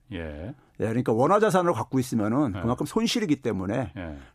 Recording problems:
none

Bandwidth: 14.5 kHz